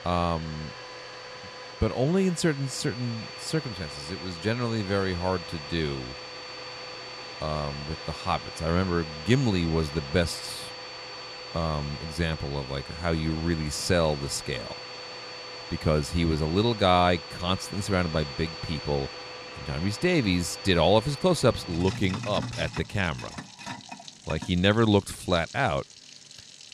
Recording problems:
household noises; noticeable; throughout; 10 dB below the speech

